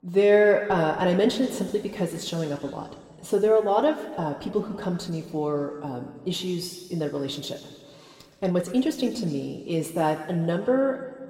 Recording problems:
room echo; slight; dies away in 1.9 s
off-mic speech; somewhat distant

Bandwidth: 16 kHz